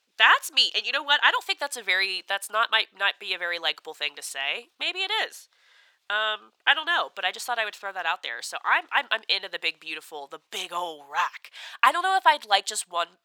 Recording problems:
thin; very; fading below 850 Hz

